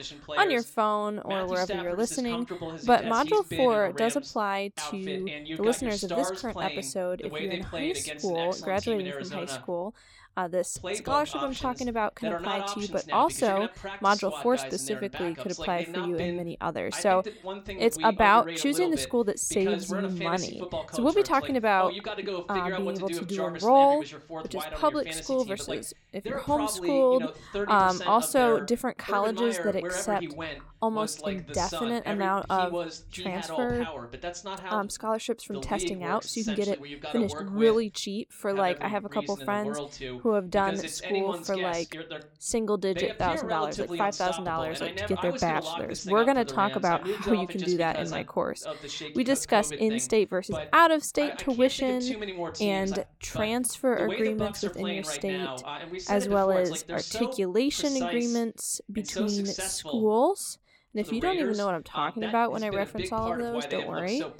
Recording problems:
voice in the background; loud; throughout; 8 dB below the speech

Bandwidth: 18 kHz